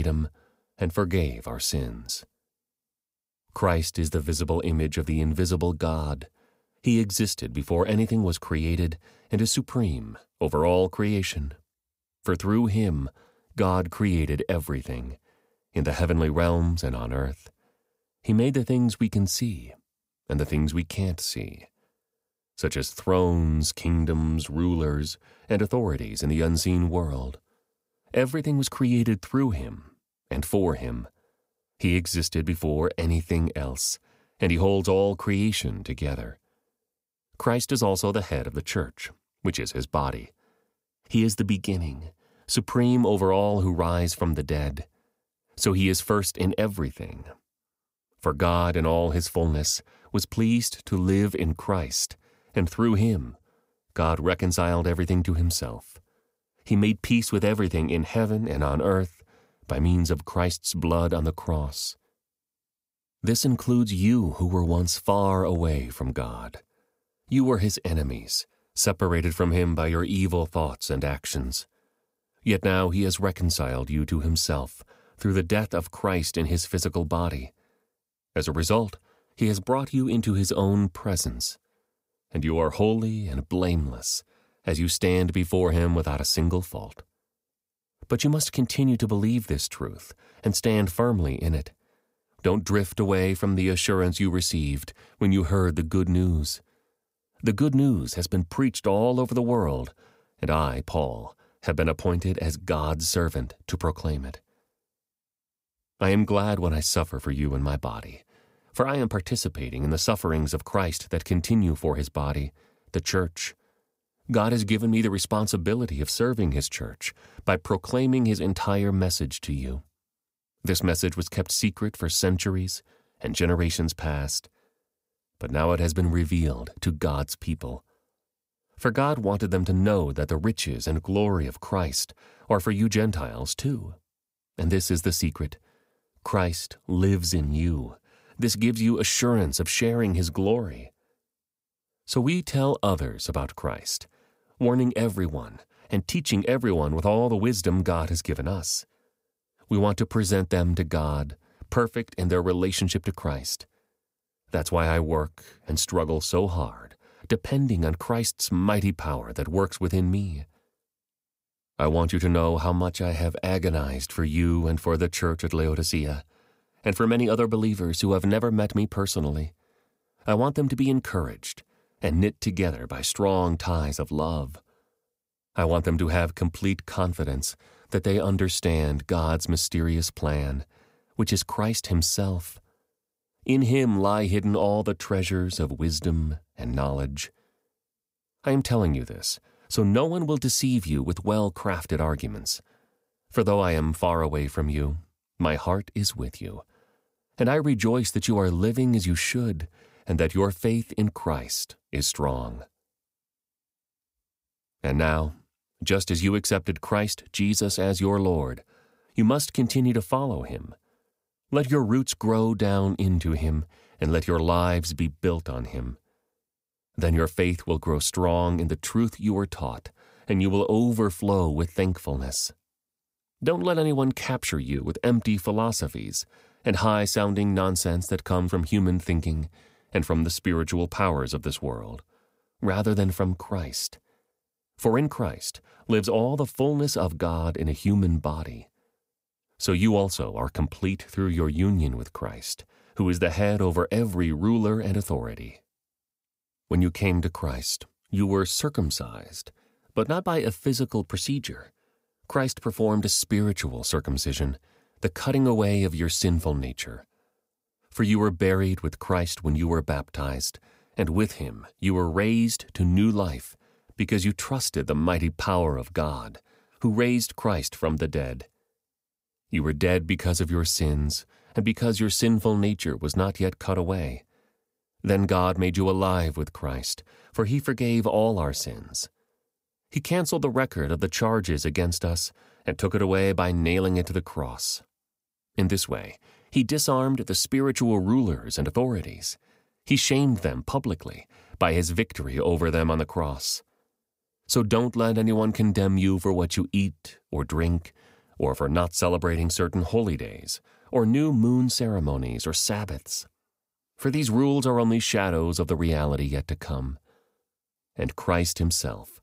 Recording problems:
abrupt cut into speech; at the start

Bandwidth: 15.5 kHz